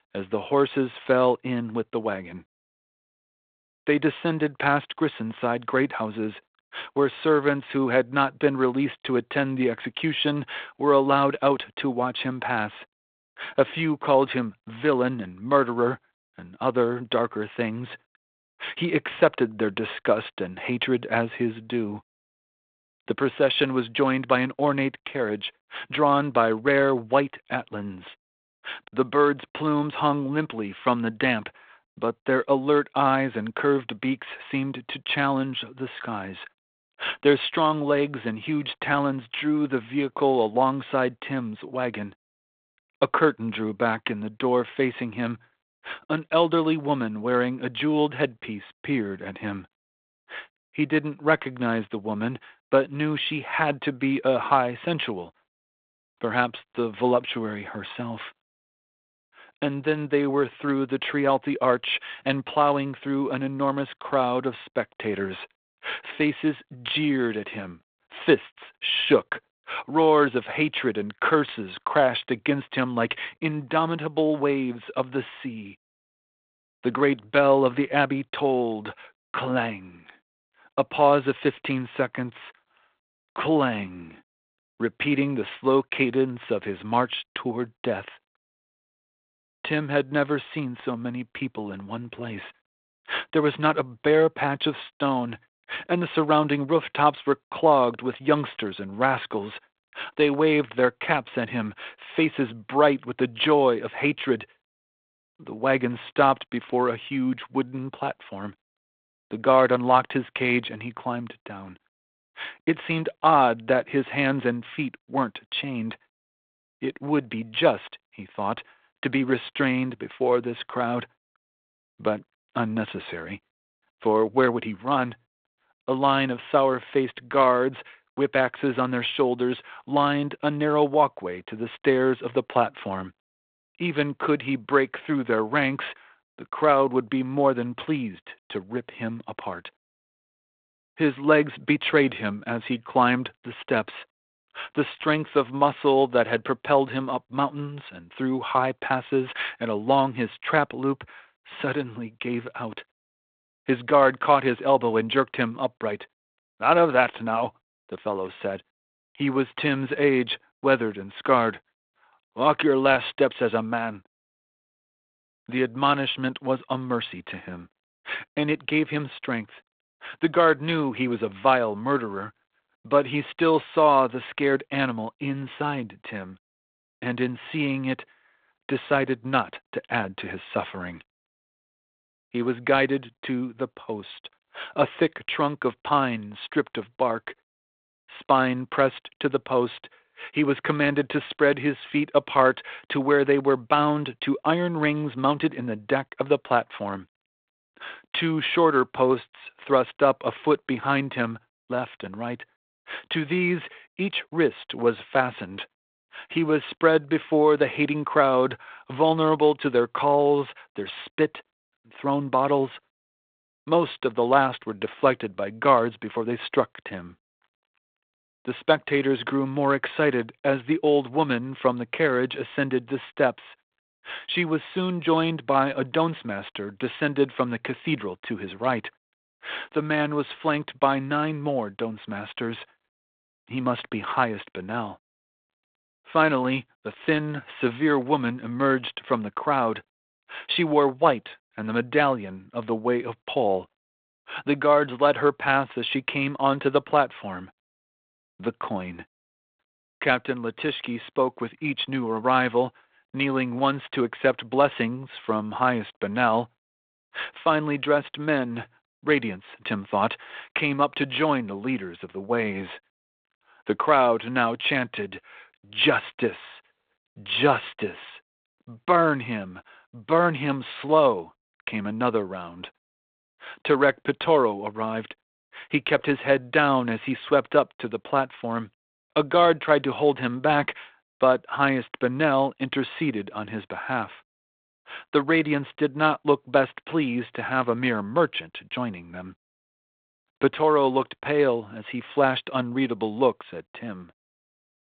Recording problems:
phone-call audio; nothing above 3.5 kHz

